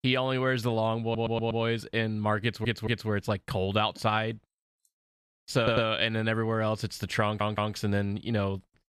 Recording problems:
audio stuttering; 4 times, first at 1 s

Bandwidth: 14 kHz